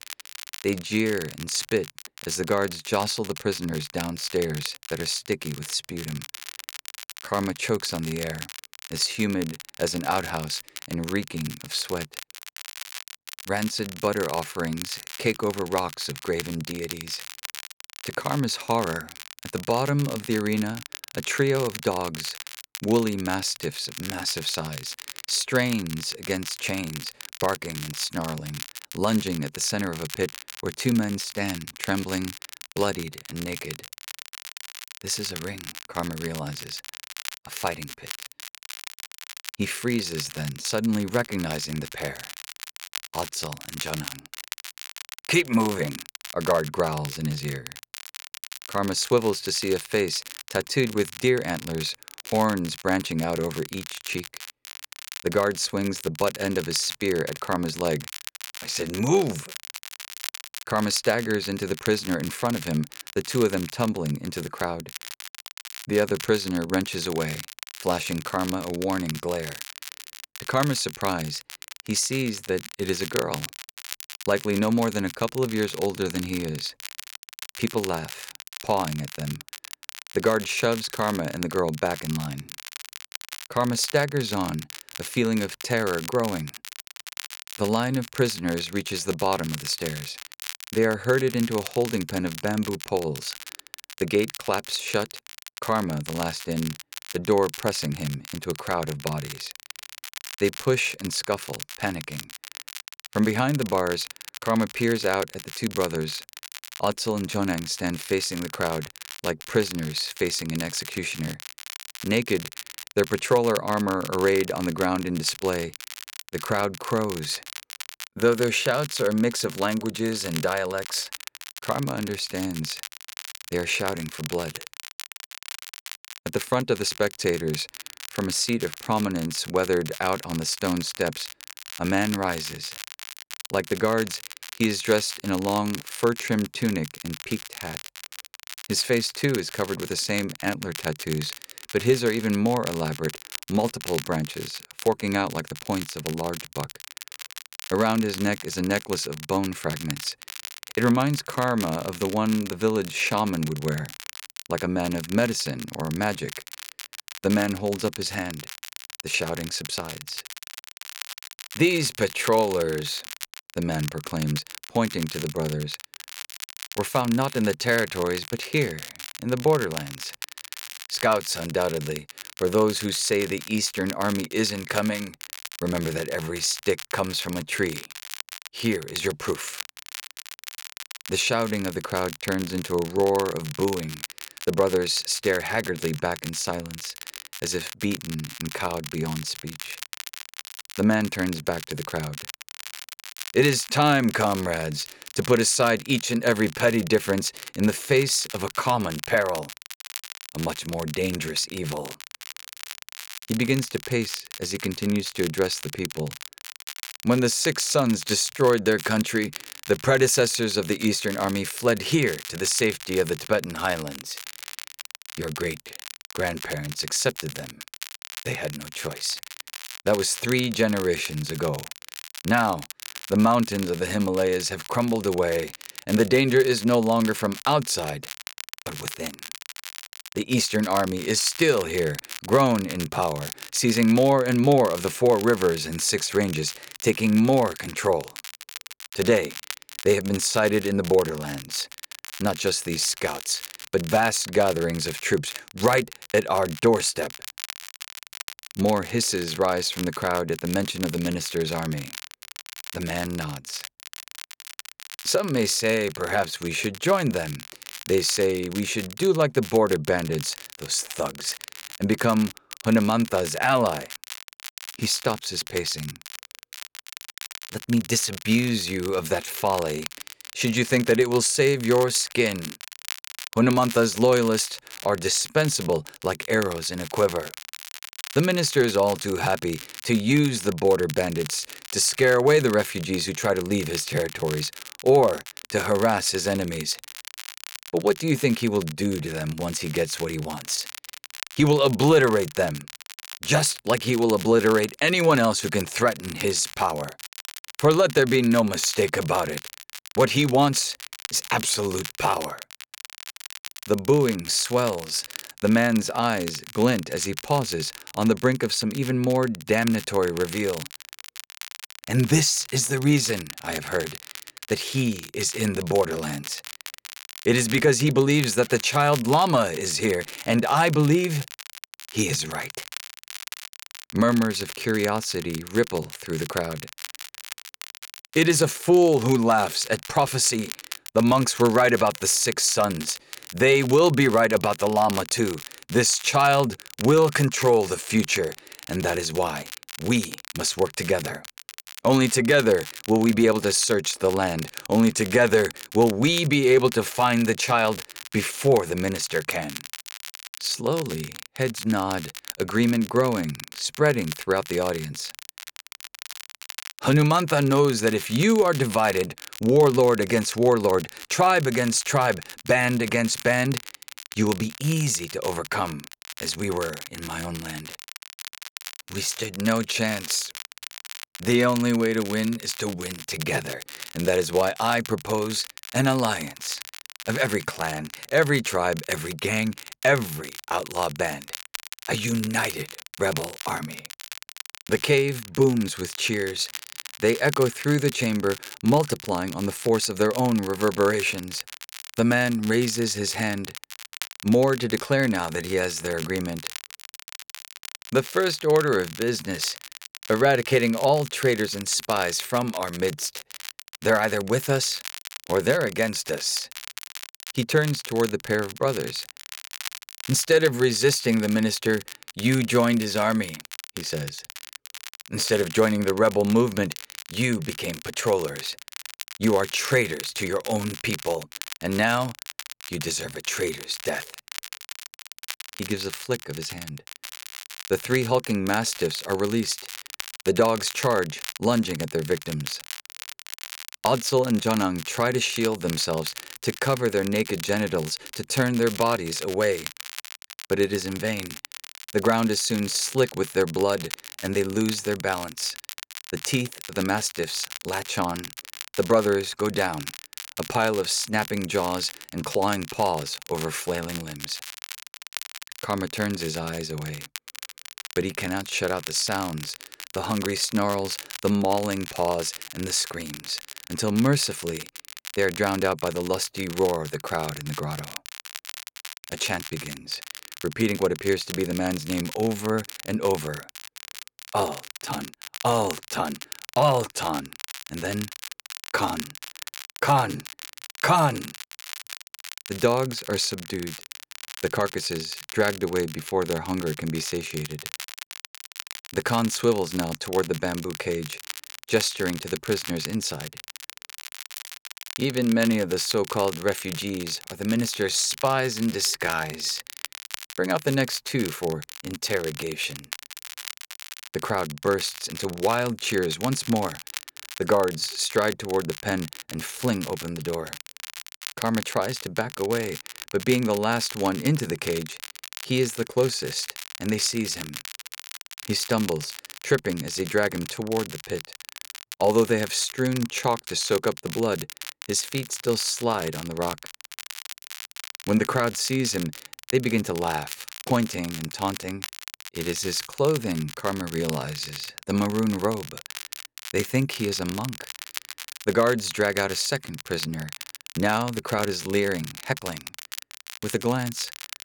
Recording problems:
crackle, like an old record; noticeable; 15 dB below the speech

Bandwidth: 18.5 kHz